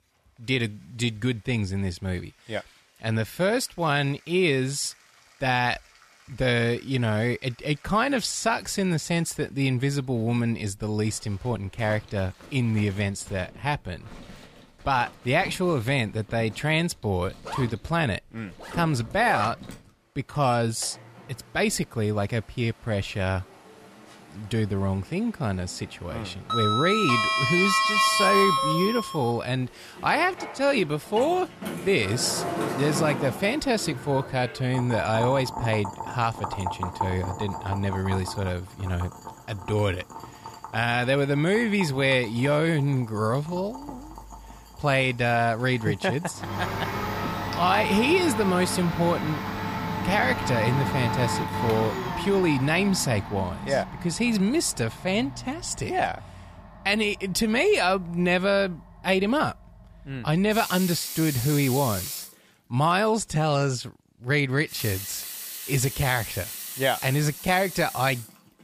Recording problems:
household noises; loud; throughout; 5 dB below the speech

